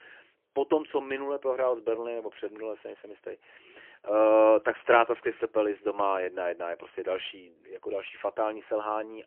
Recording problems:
phone-call audio; poor line; nothing above 3 kHz

